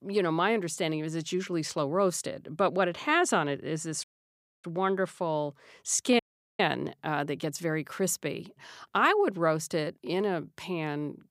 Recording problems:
audio cutting out; at 4 s for 0.5 s and at 6 s

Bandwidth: 15.5 kHz